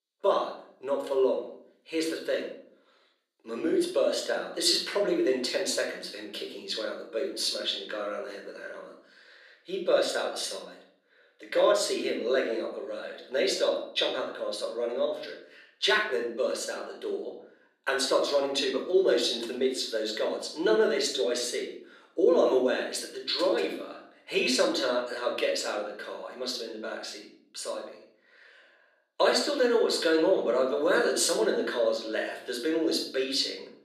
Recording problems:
room echo; noticeable; dies away in 0.5 s
thin; somewhat; fading below 250 Hz
off-mic speech; somewhat distant

